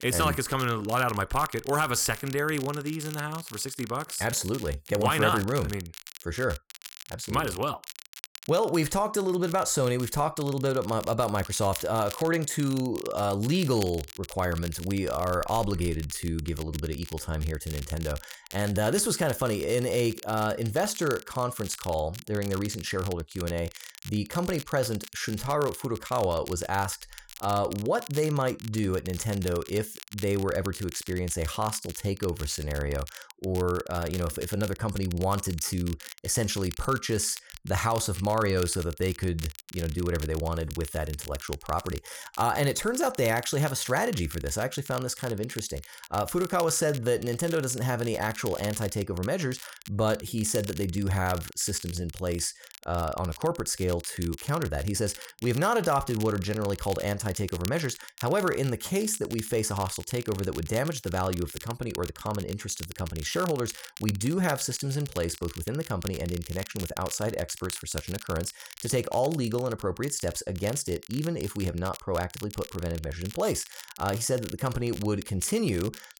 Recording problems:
crackle, like an old record; noticeable; 15 dB below the speech

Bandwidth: 17.5 kHz